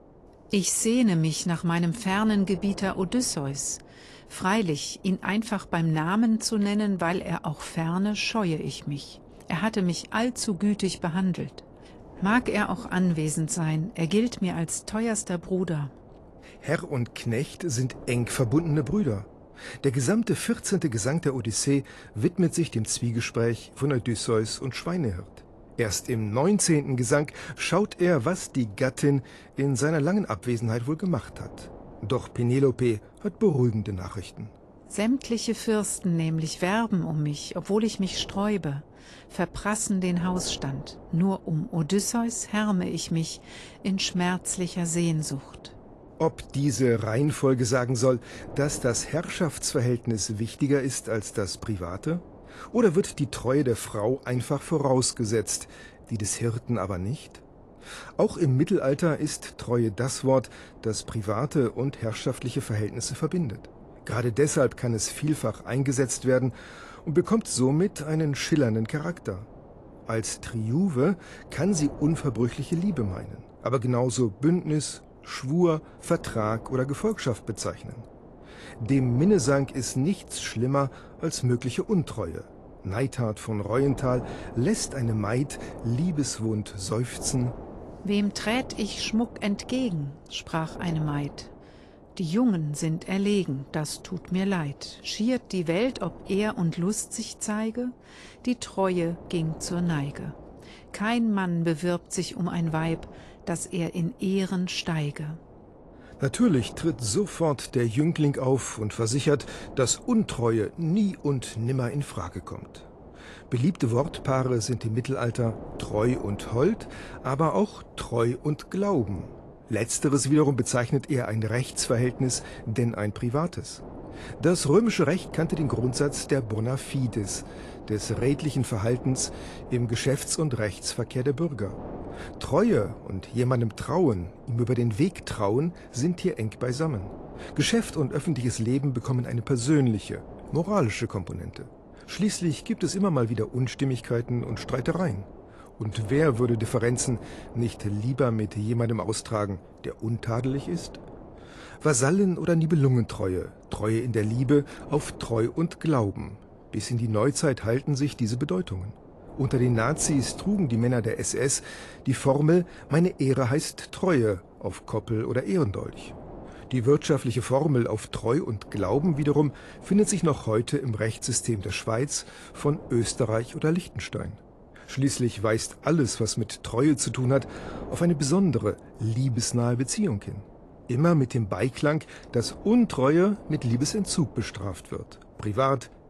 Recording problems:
garbled, watery; slightly; nothing above 11 kHz
wind noise on the microphone; occasional gusts; 20 dB below the speech

